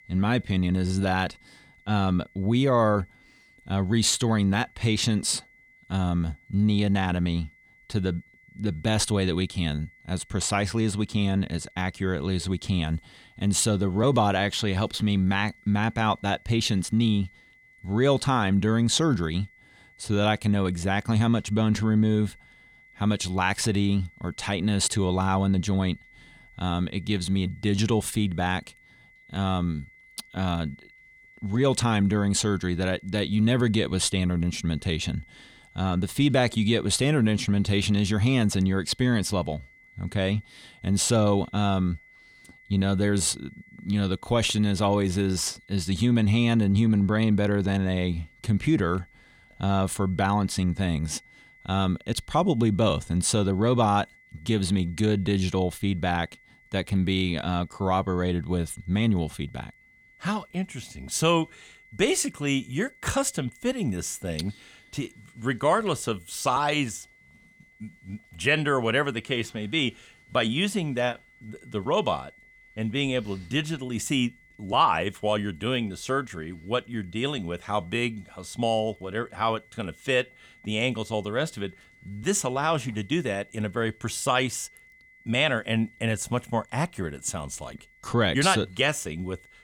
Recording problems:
high-pitched whine; faint; throughout; 2 kHz, 30 dB below the speech

